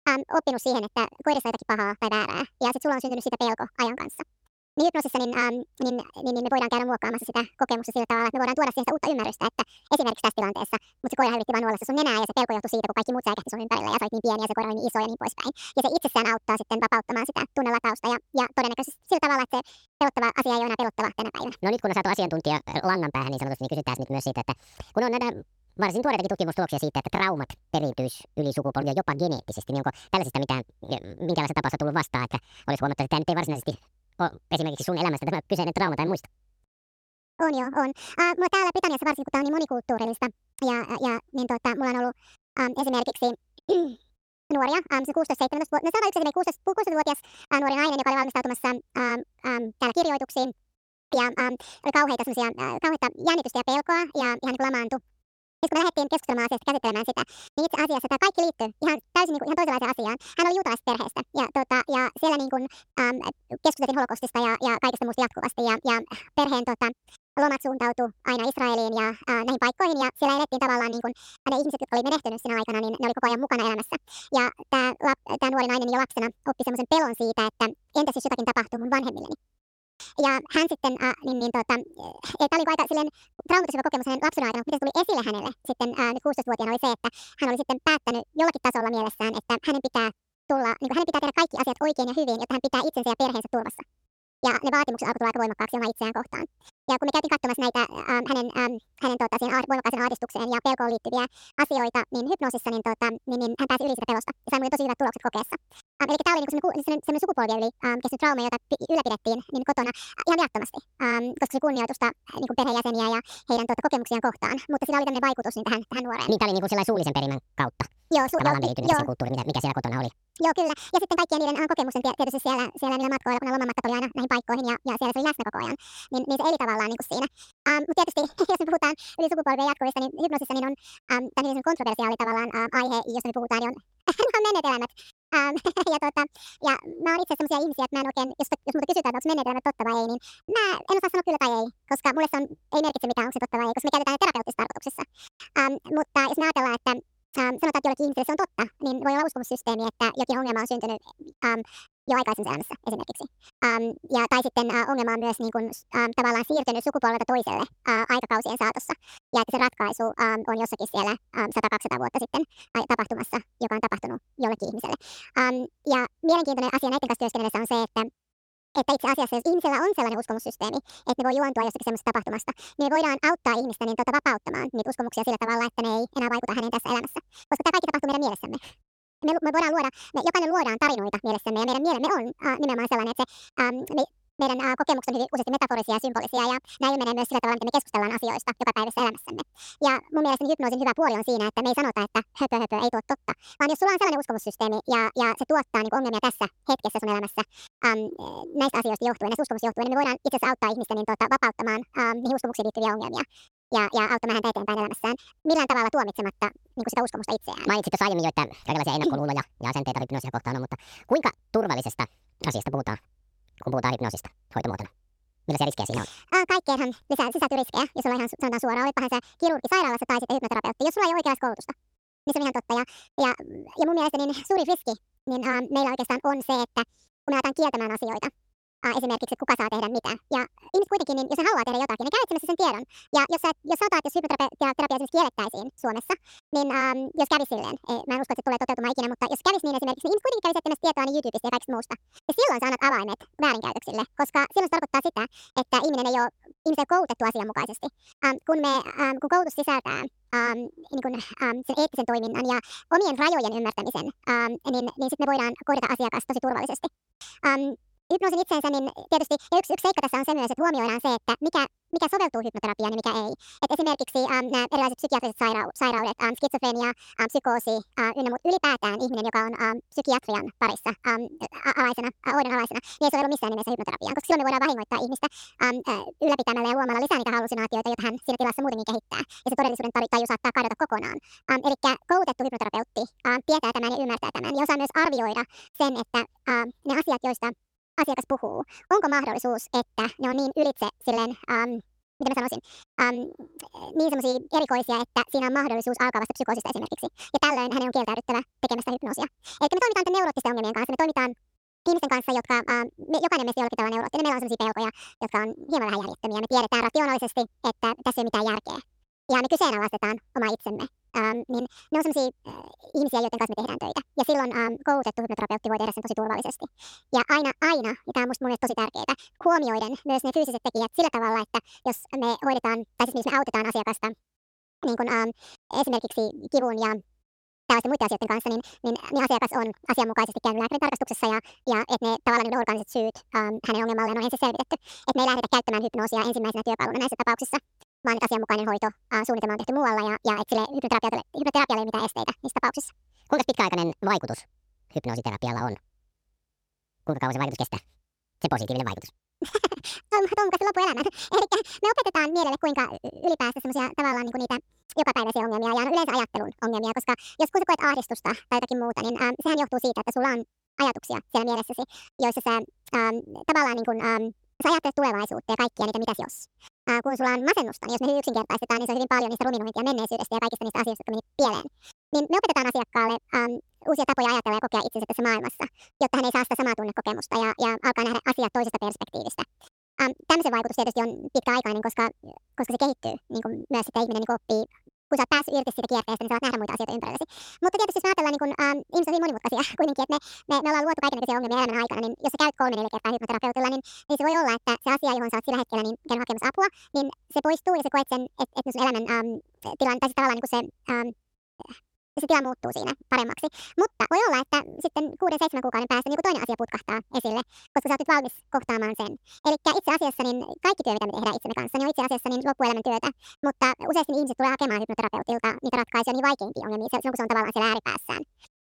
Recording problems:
wrong speed and pitch; too fast and too high; 1.6 times normal speed

